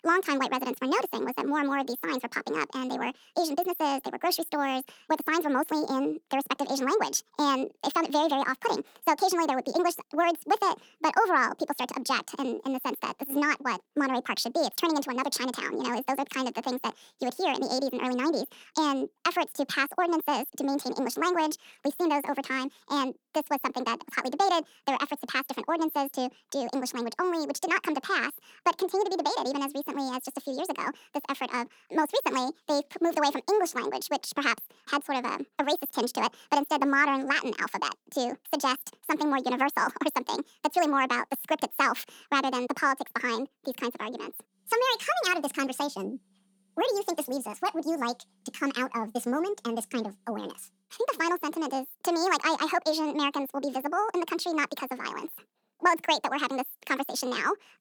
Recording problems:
wrong speed and pitch; too fast and too high; 1.6 times normal speed

